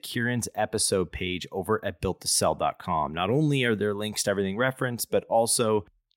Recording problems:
none

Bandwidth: 16 kHz